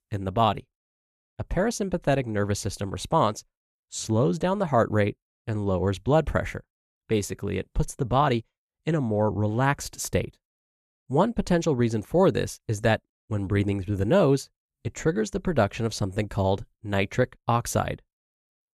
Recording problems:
none

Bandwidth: 14 kHz